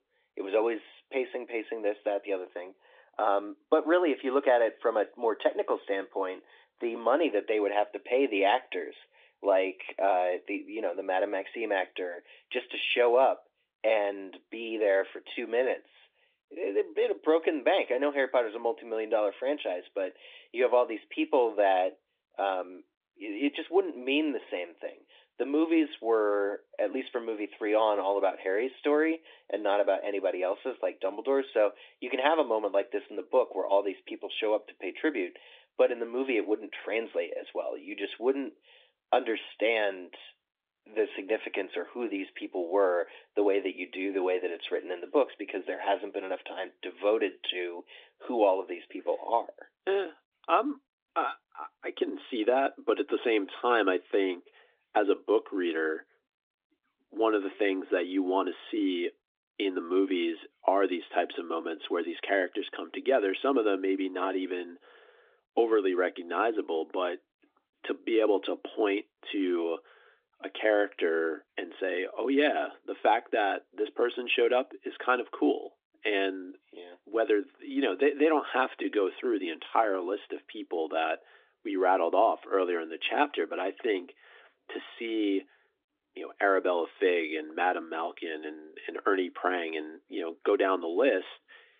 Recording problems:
phone-call audio

